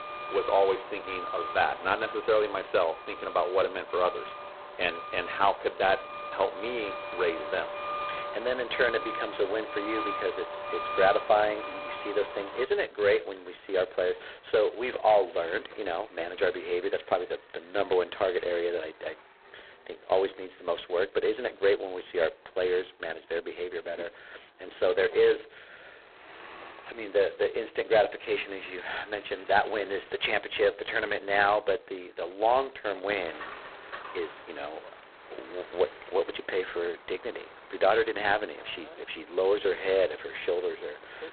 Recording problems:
phone-call audio; poor line; nothing above 4 kHz
traffic noise; noticeable; throughout; 10 dB below the speech

